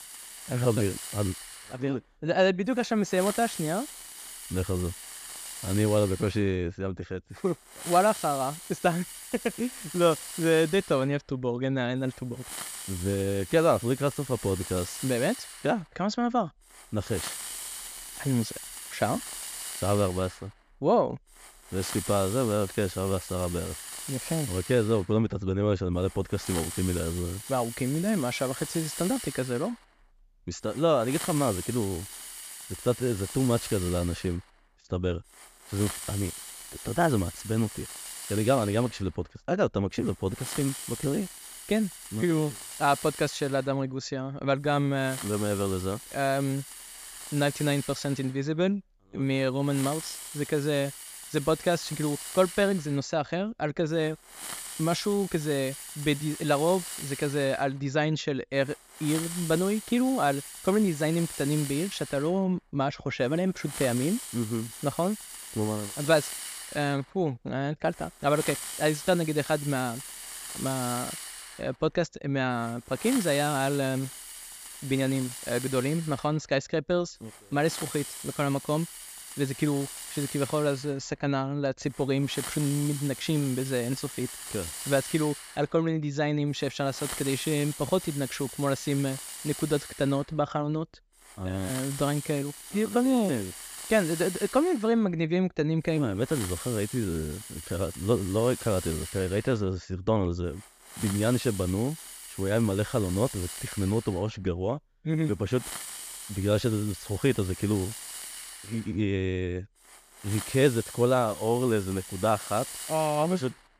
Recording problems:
high frequencies cut off; noticeable; nothing above 8 kHz
hiss; loud; throughout; 9 dB below the speech

